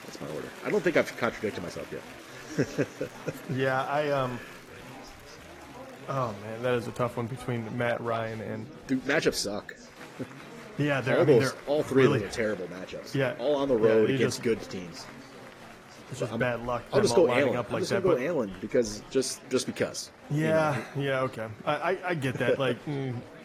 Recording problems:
garbled, watery; slightly; nothing above 14.5 kHz
chatter from many people; noticeable; throughout; 20 dB below the speech

